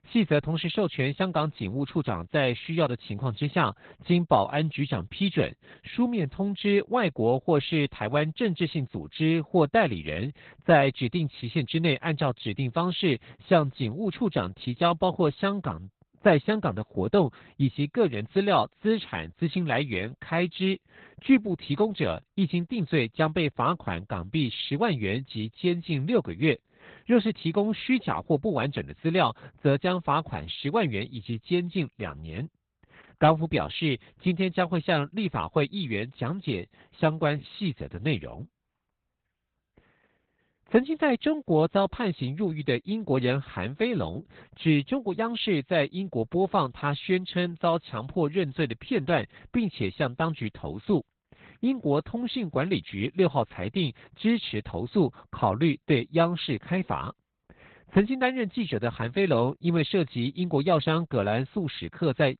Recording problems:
garbled, watery; badly; nothing above 4 kHz

